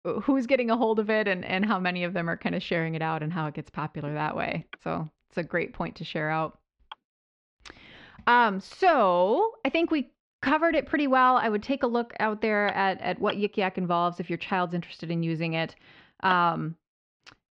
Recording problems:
muffled; slightly; fading above 3.5 kHz

